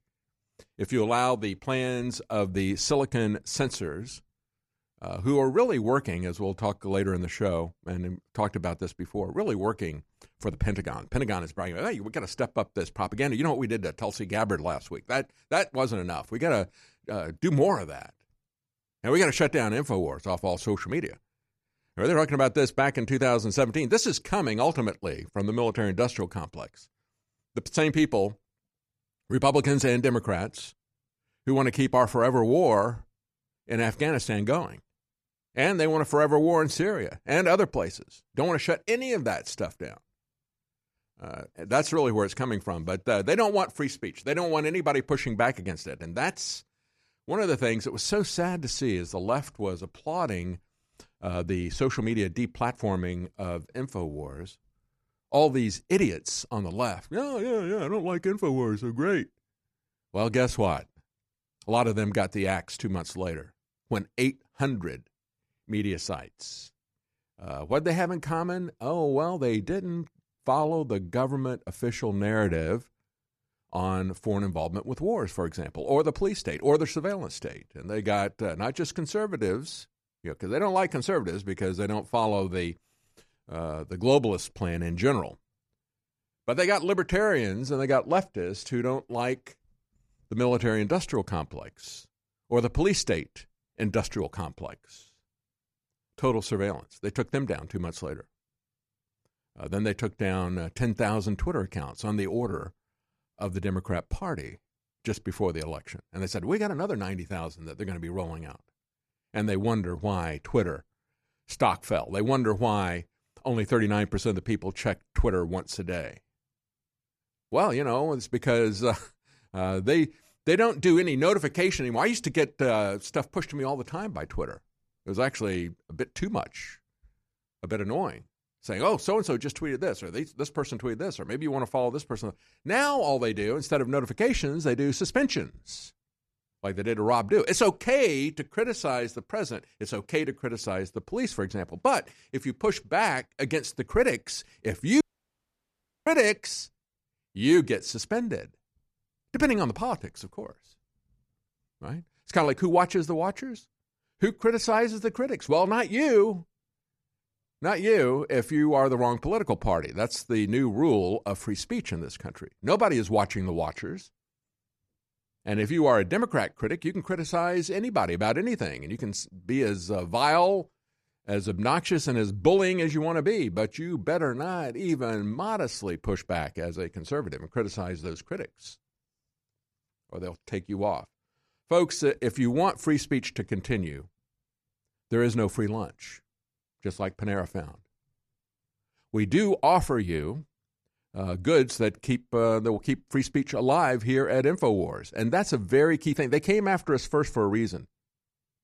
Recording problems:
audio cutting out; at 2:25 for 1 s

